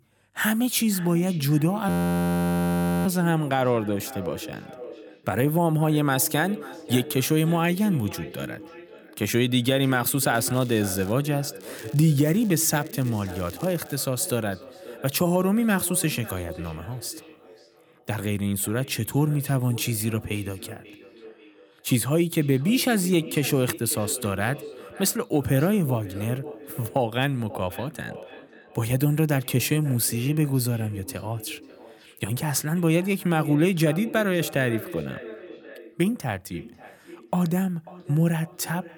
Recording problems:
echo of what is said; noticeable; throughout; 540 ms later, 15 dB below the speech
crackling; faint; at 10 s and from 12 to 14 s; 25 dB below the speech
audio freezing; at 2 s for 1 s

